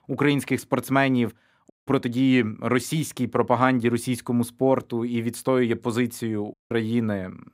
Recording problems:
audio cutting out; at 1.5 s and at 6.5 s

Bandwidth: 15.5 kHz